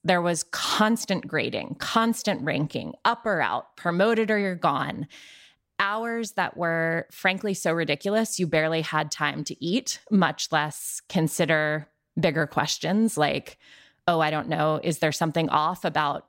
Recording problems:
none

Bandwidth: 16 kHz